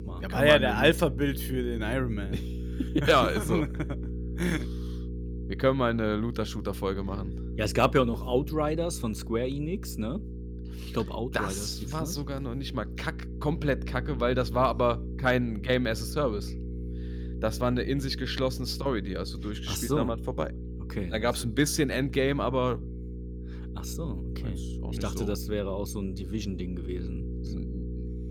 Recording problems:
electrical hum; noticeable; throughout; 60 Hz, 20 dB below the speech

